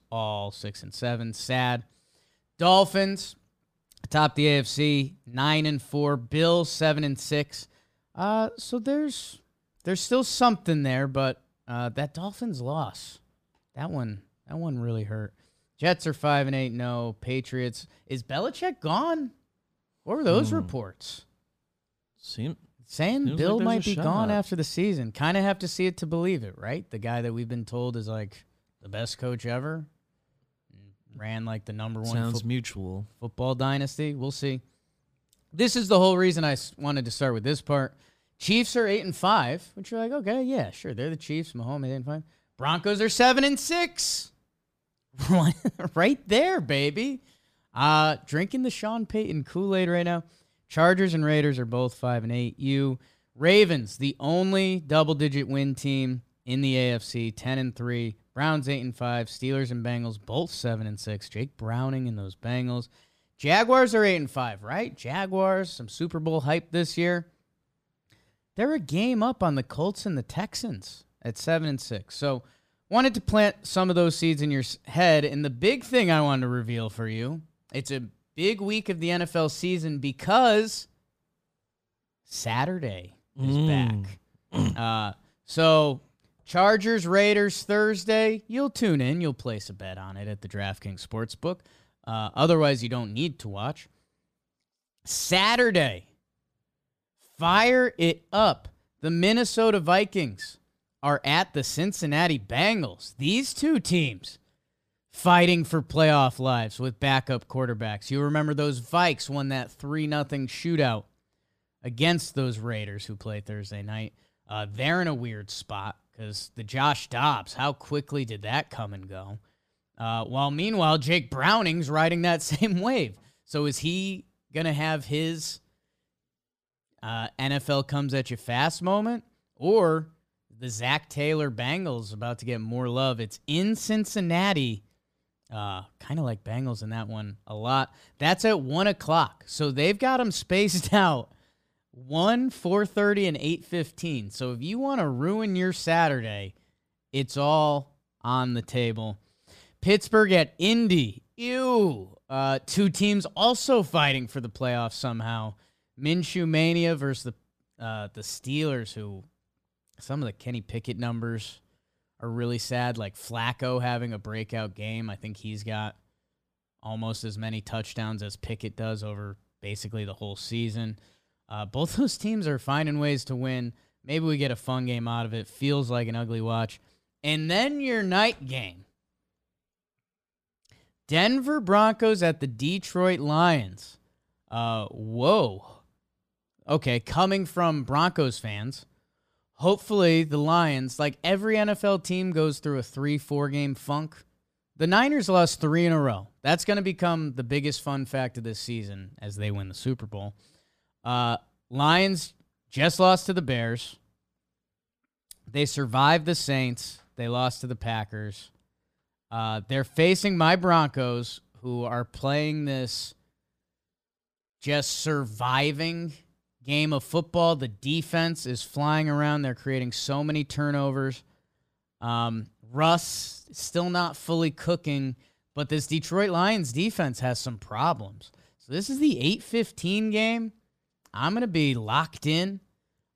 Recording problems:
none

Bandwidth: 15 kHz